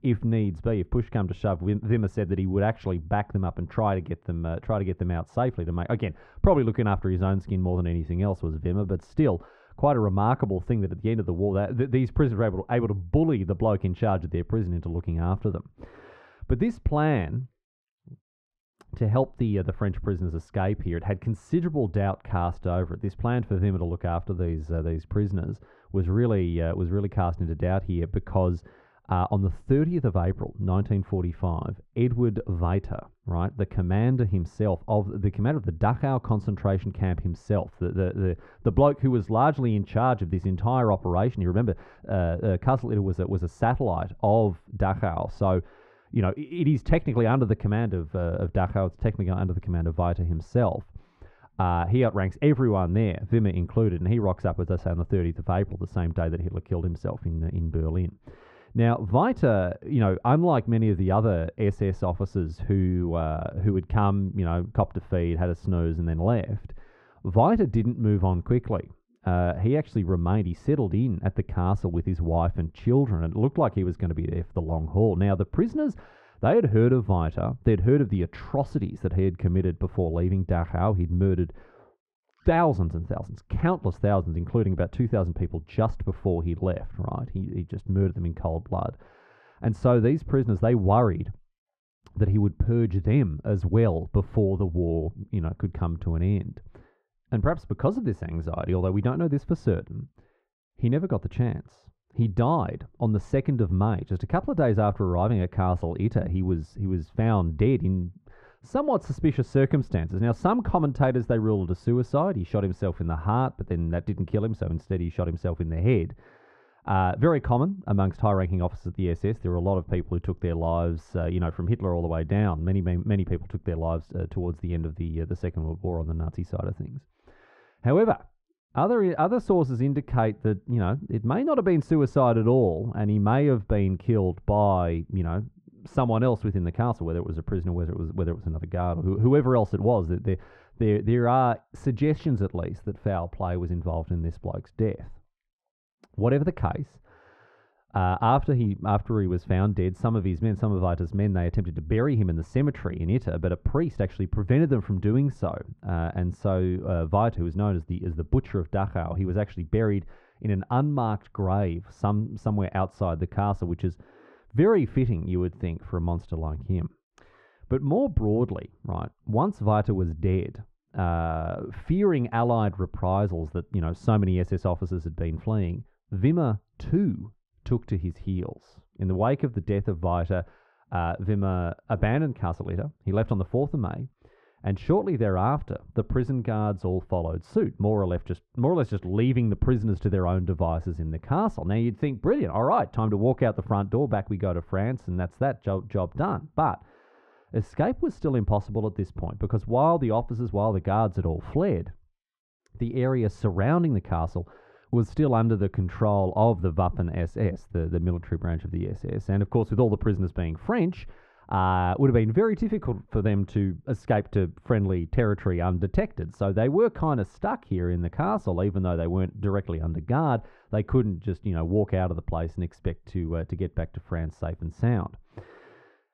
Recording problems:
muffled; very; fading above 1.5 kHz

